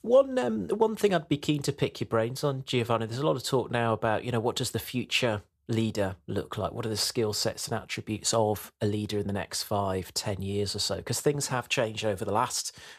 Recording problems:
none

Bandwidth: 14.5 kHz